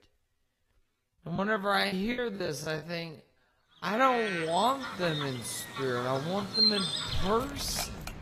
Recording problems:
wrong speed, natural pitch; too slow; 0.5 times normal speed
garbled, watery; slightly; nothing above 14 kHz
animal sounds; loud; from 4.5 s on; 1 dB below the speech
background music; very faint; from 6 s on; 20 dB below the speech
choppy; very; from 1.5 to 4 s; 10% of the speech affected

